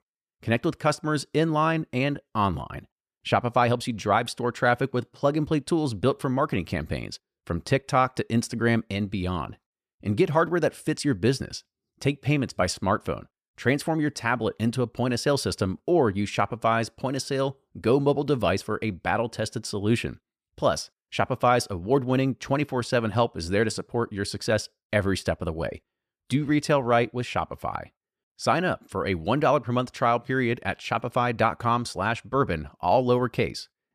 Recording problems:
none

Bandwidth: 14.5 kHz